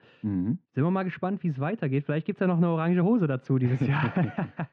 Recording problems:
muffled; very; fading above 3 kHz

